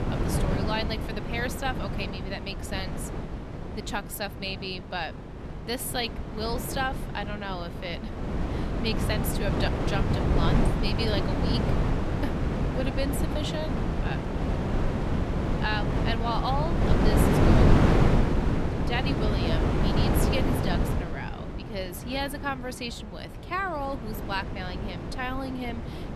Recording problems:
wind noise on the microphone; heavy; as loud as the speech

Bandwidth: 13.5 kHz